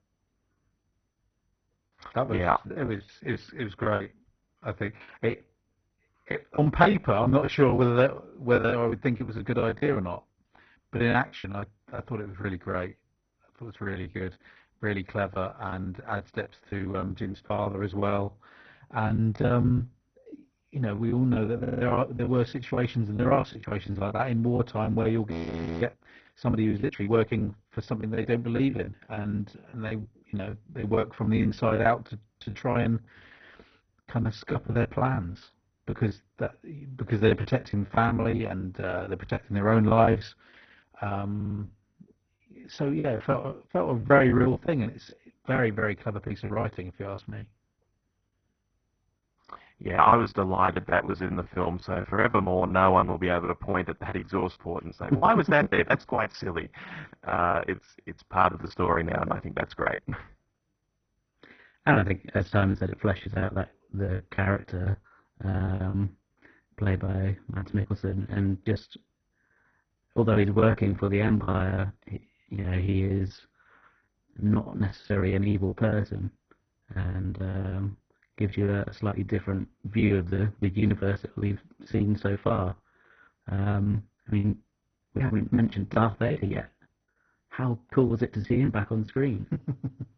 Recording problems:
garbled, watery; badly; nothing above 6 kHz
muffled; very slightly; fading above 2 kHz
choppy; very; 16% of the speech affected
audio stuttering; at 22 s and at 41 s
audio freezing; at 25 s for 0.5 s

